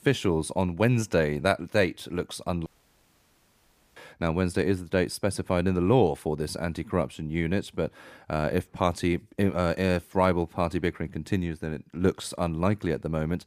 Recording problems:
audio cutting out; at 2.5 s for 1.5 s

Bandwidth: 15 kHz